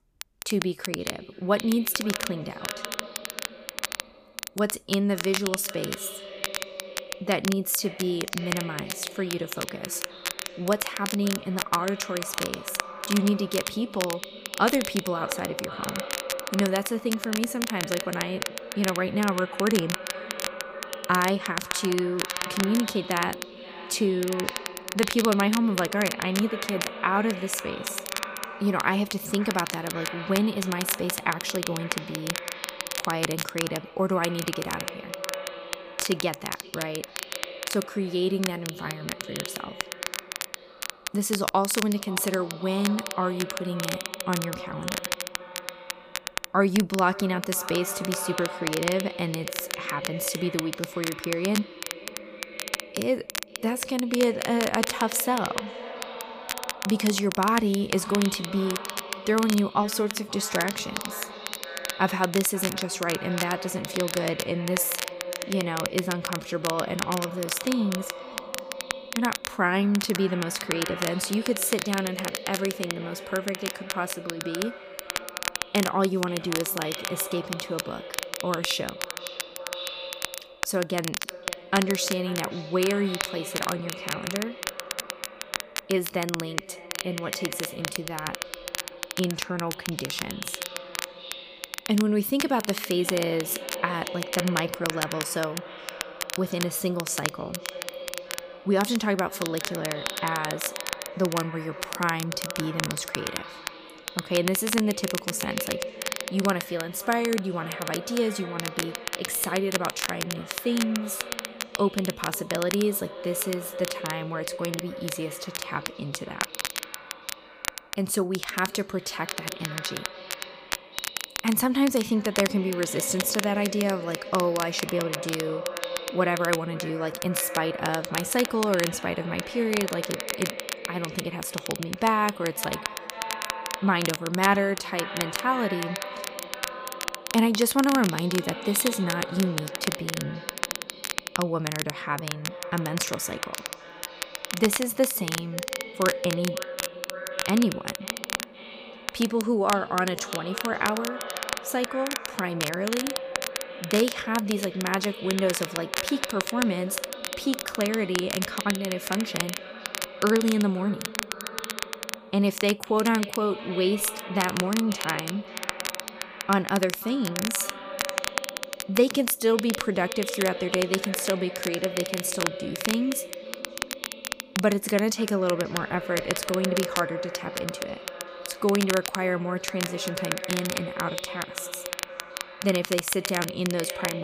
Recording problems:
echo of what is said; strong; throughout; 530 ms later, 10 dB below the speech
crackle, like an old record; loud; 6 dB below the speech
abrupt cut into speech; at the end

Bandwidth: 15 kHz